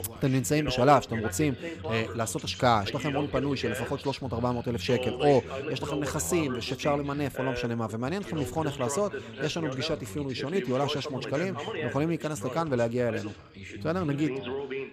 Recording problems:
background chatter; loud; throughout; 2 voices, 8 dB below the speech

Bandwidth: 15 kHz